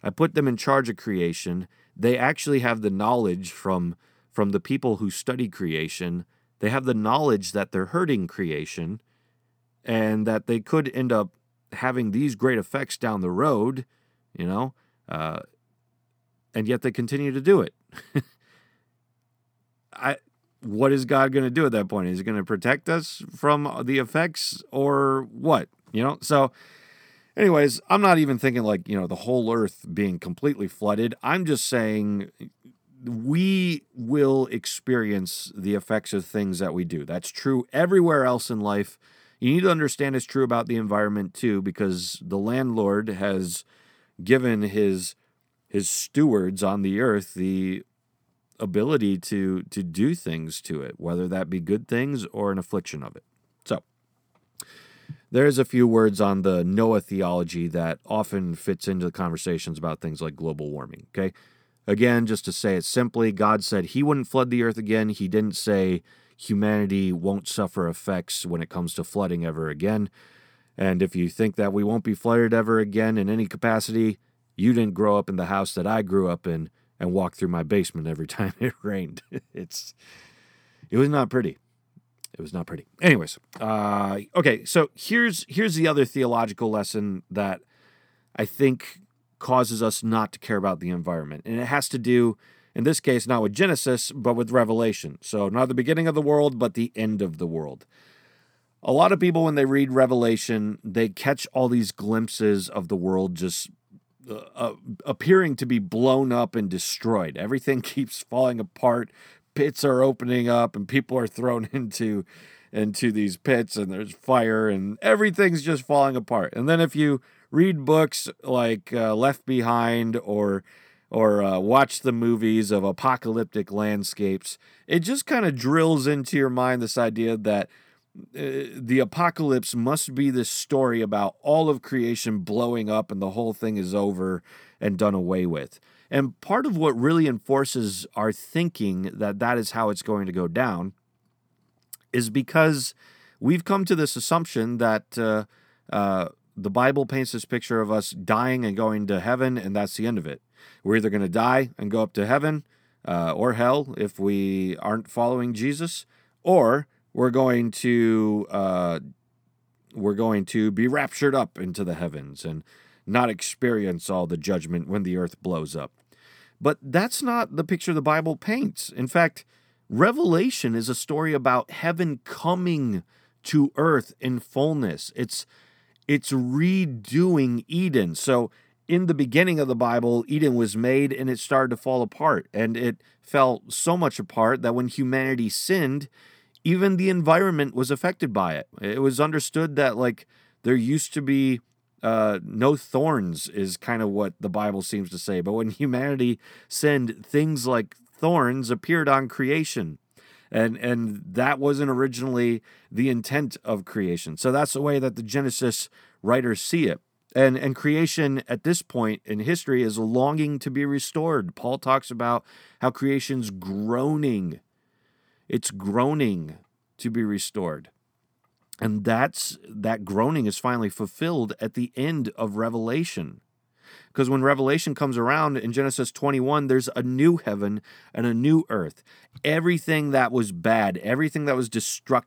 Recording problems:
none

